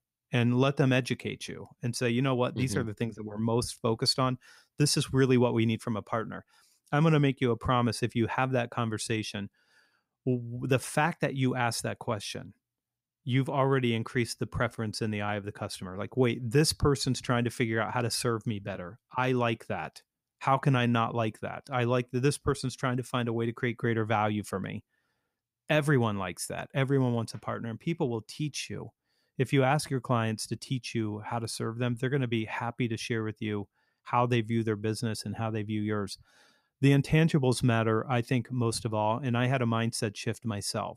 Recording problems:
none

